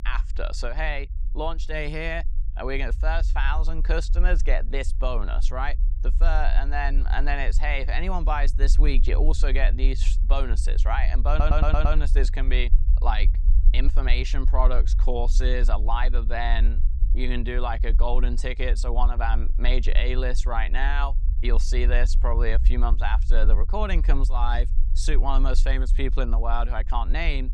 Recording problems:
low rumble; noticeable; throughout; 20 dB below the speech
audio stuttering; at 11 s

